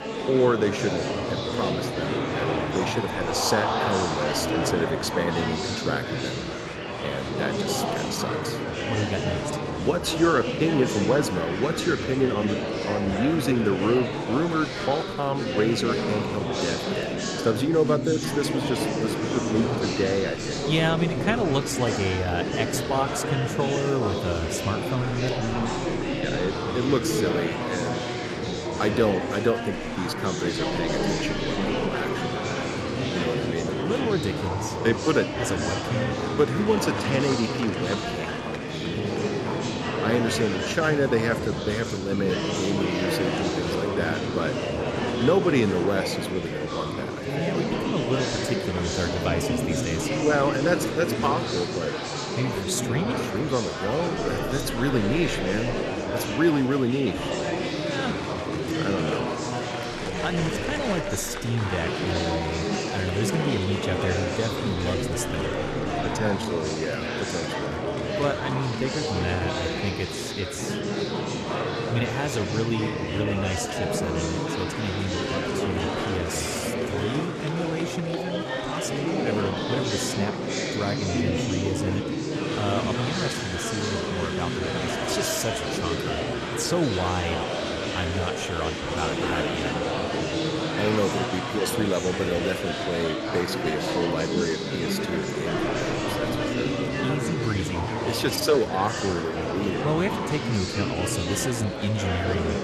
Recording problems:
murmuring crowd; very loud; throughout; as loud as the speech

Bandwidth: 13.5 kHz